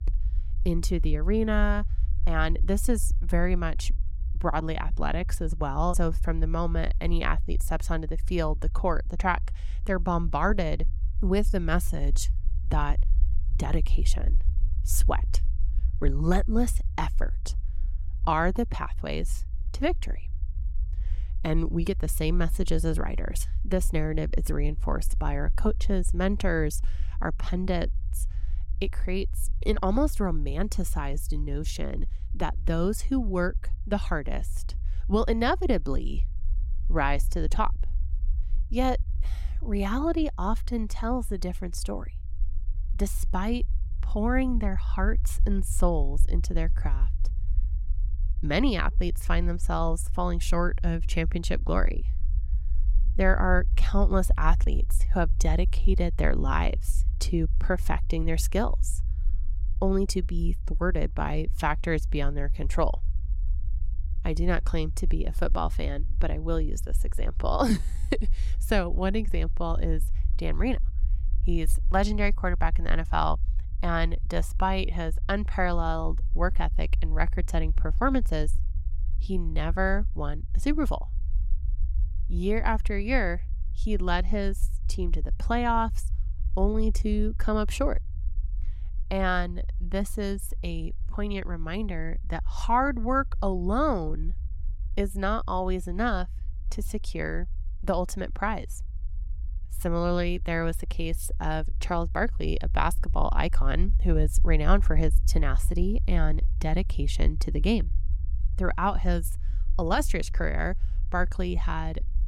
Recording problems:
low rumble; faint; throughout; 25 dB below the speech

